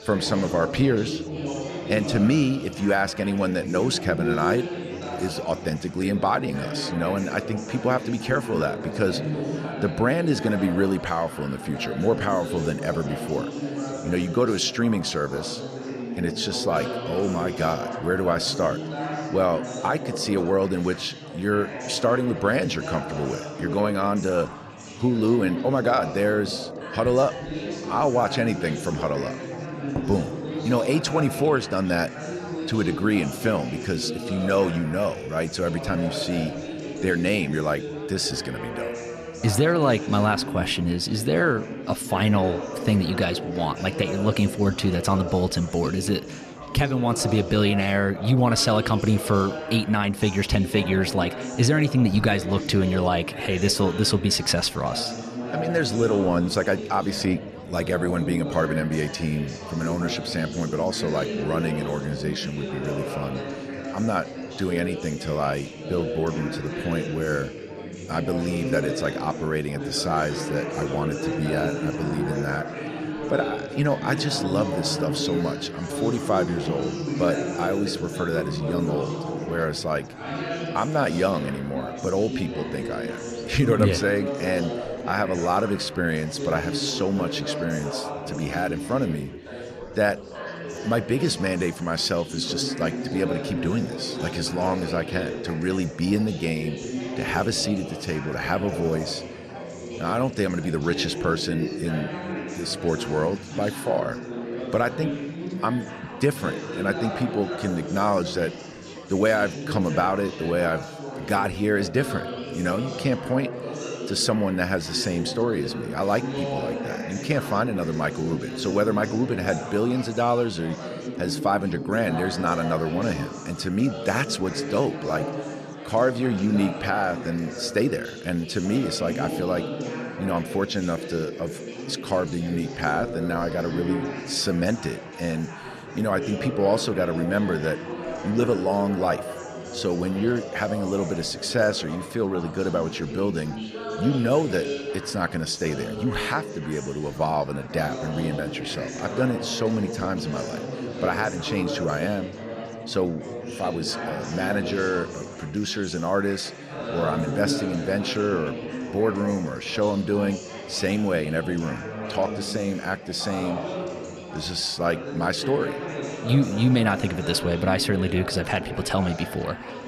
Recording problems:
chatter from many people; loud; throughout; 7 dB below the speech

